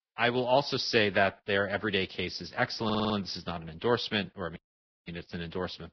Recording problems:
garbled, watery; badly; nothing above 5.5 kHz
audio stuttering; at 3 s
audio cutting out; at 4.5 s for 0.5 s

